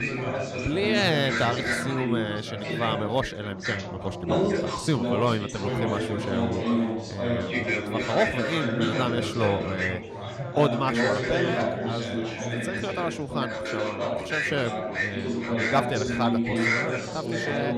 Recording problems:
chatter from many people; very loud; throughout; 1 dB above the speech

